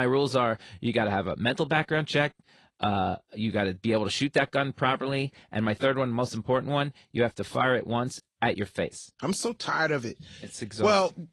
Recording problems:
garbled, watery; slightly
abrupt cut into speech; at the start

